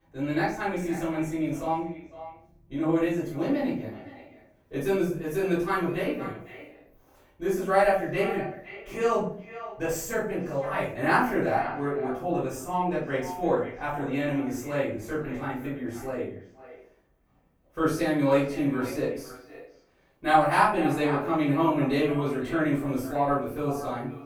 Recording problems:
off-mic speech; far
echo of what is said; noticeable; throughout; 510 ms later, 15 dB below the speech
room echo; noticeable; dies away in 0.4 s

